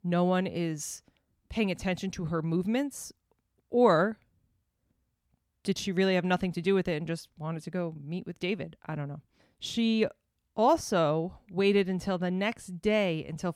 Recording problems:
none

